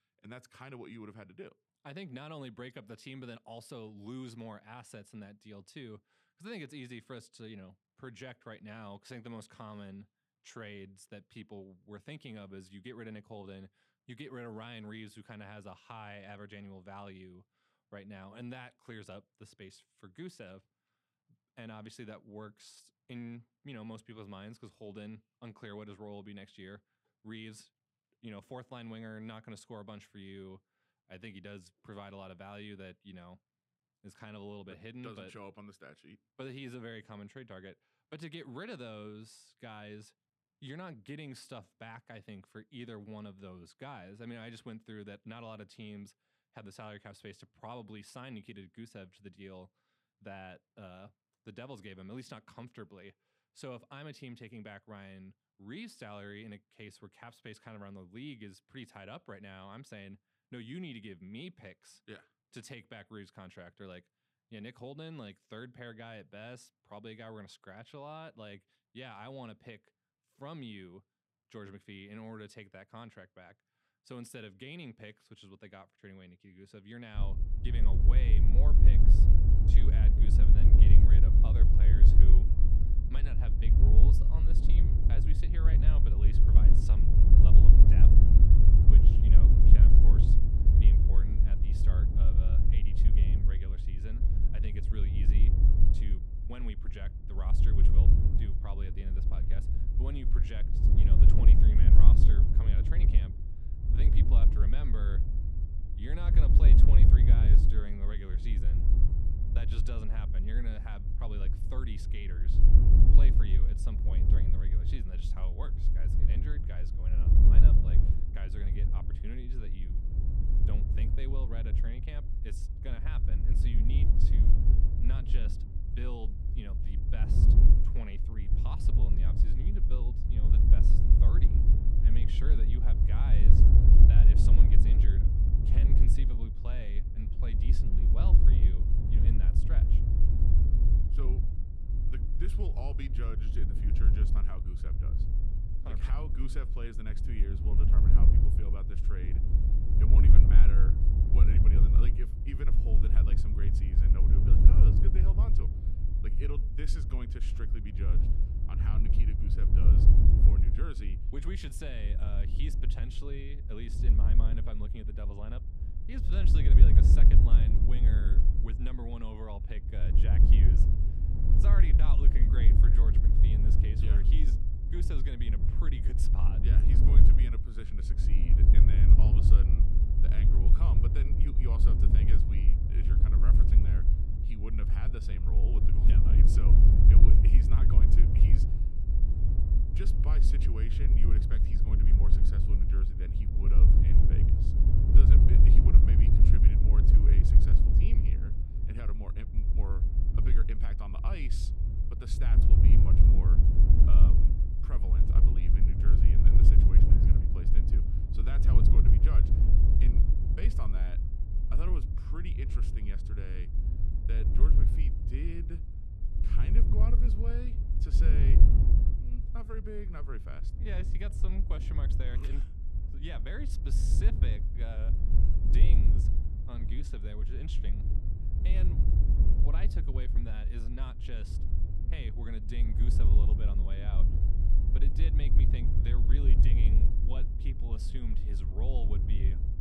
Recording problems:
wind noise on the microphone; heavy; from 1:17 on; 3 dB above the speech

